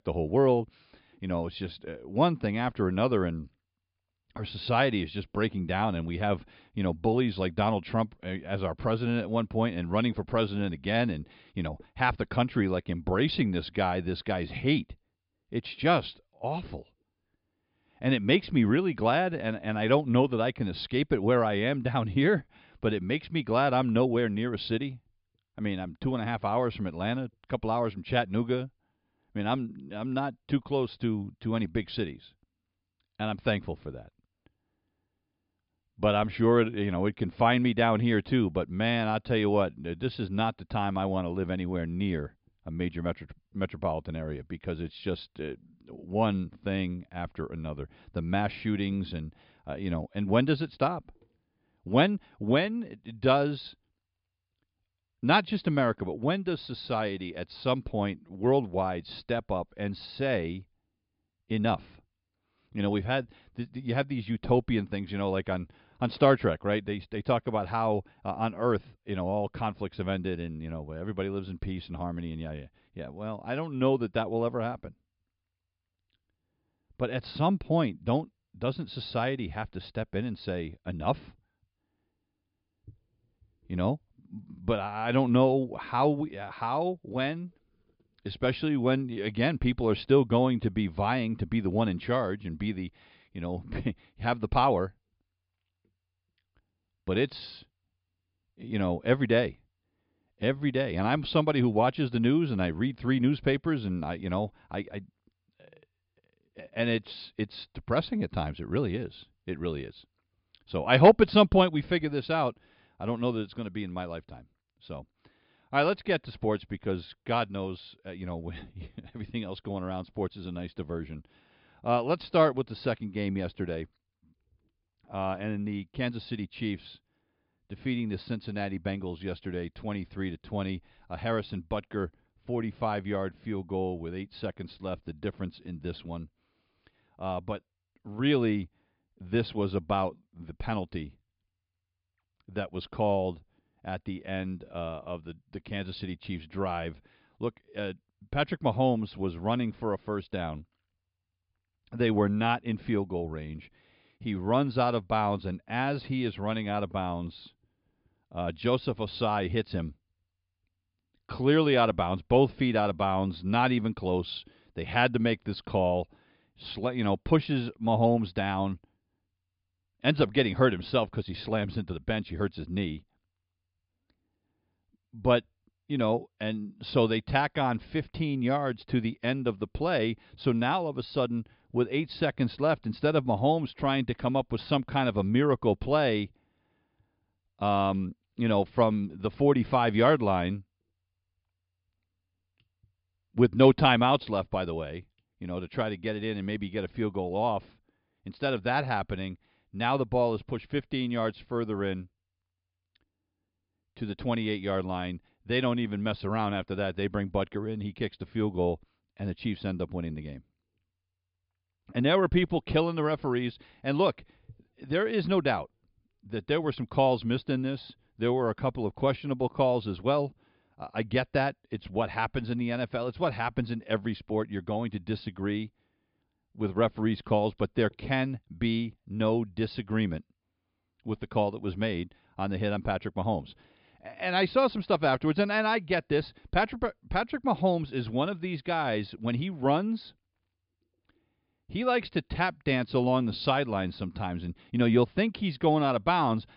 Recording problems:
high frequencies cut off; noticeable; nothing above 5 kHz

